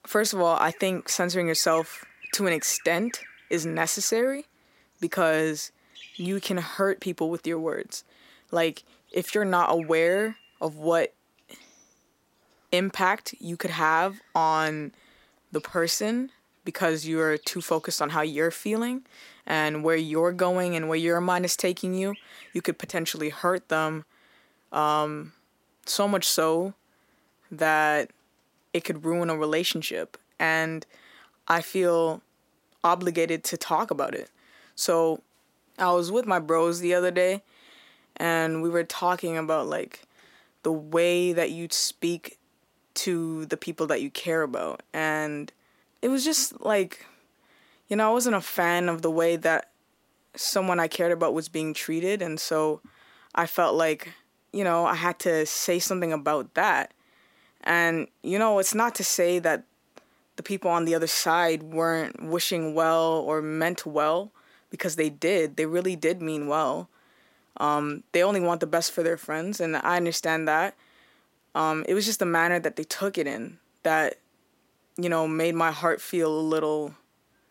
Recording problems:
animal sounds; faint; throughout; 25 dB below the speech

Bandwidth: 16 kHz